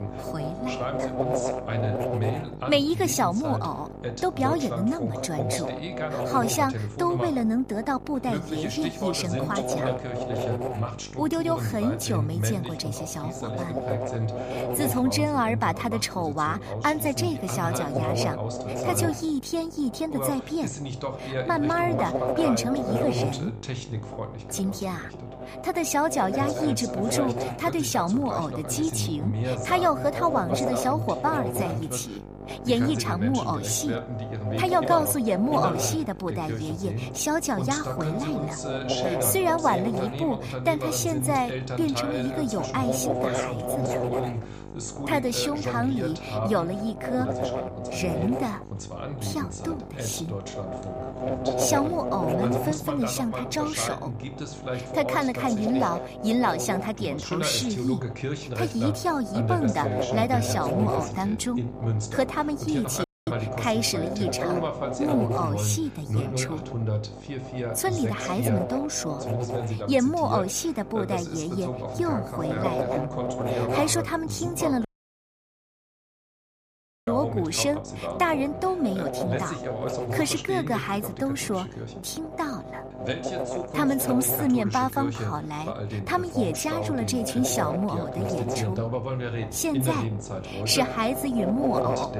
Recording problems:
electrical hum; loud; throughout; 50 Hz, 5 dB below the speech
voice in the background; loud; throughout; 6 dB below the speech
audio cutting out; at 1:03 and at 1:15 for 2 s

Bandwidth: 15 kHz